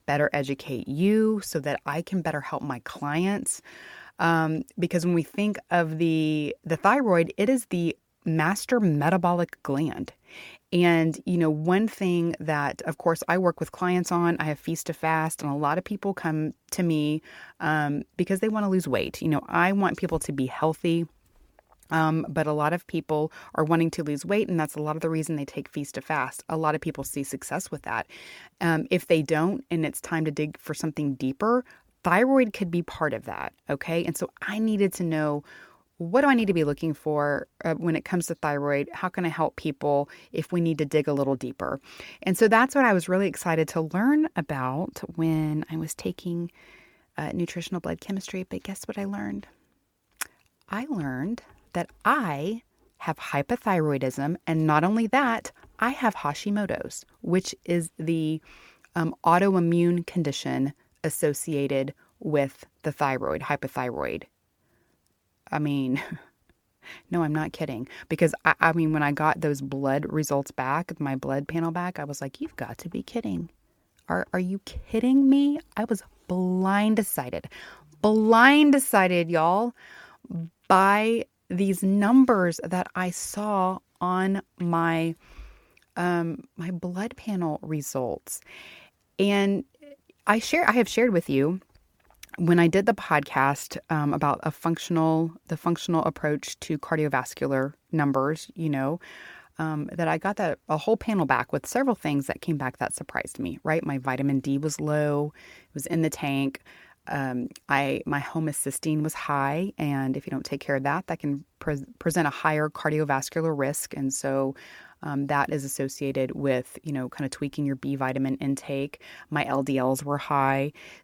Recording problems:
none

